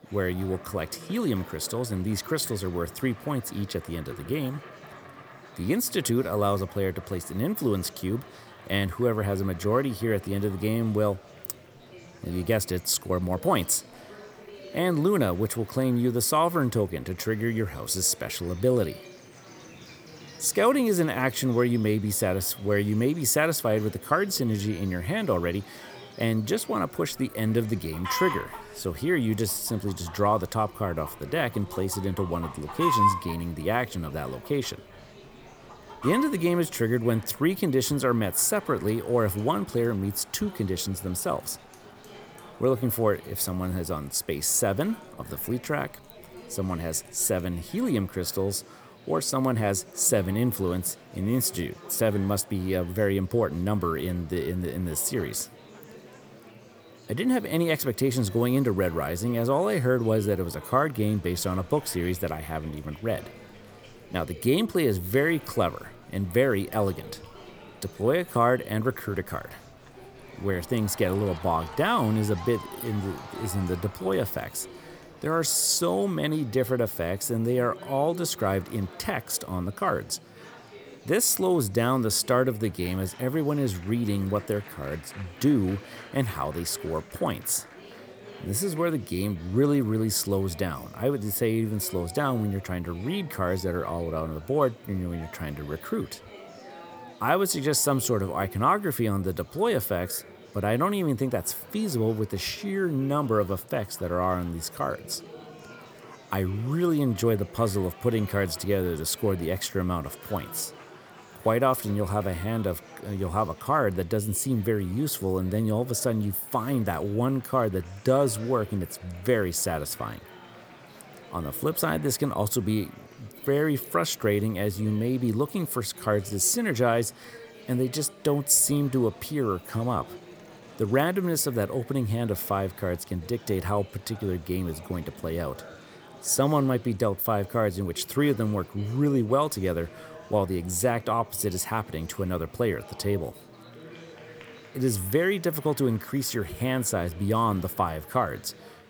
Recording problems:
animal sounds; noticeable; until 1:15; 10 dB below the speech
murmuring crowd; noticeable; throughout; 20 dB below the speech

